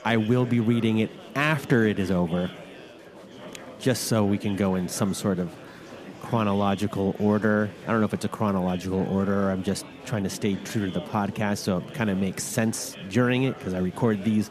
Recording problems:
chatter from many people; noticeable; throughout; 15 dB below the speech

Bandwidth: 14.5 kHz